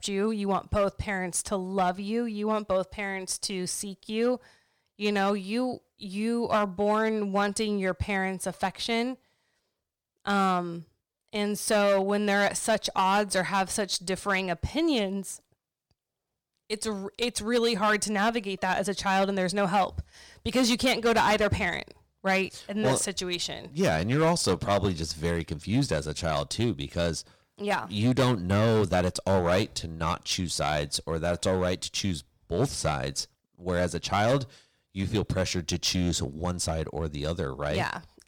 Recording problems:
distortion; slight; 4% of the sound clipped

